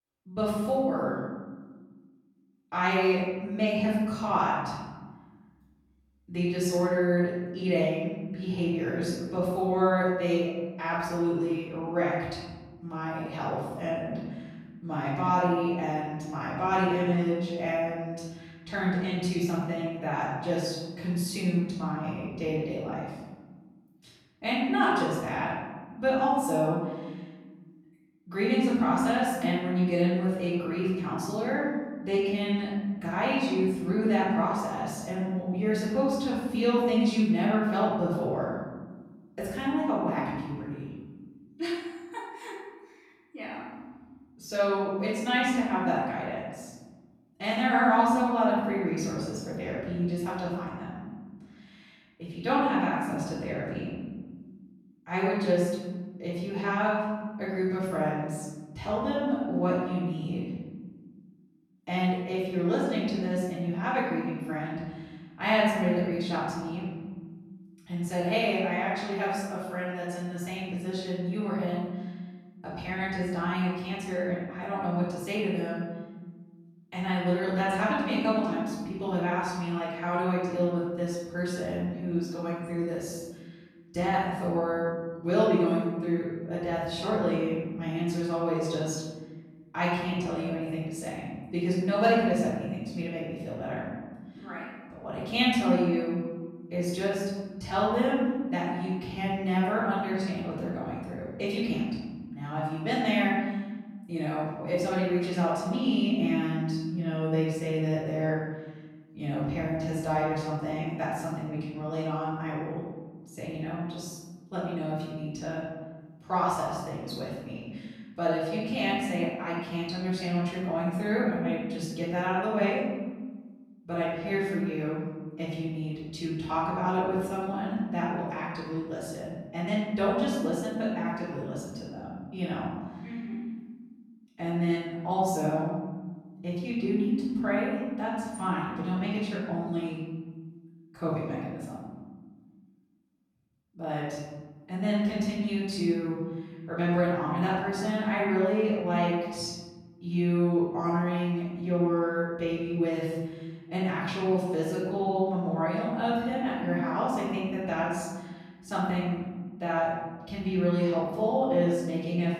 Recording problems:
off-mic speech; far
room echo; noticeable; dies away in 1.4 s

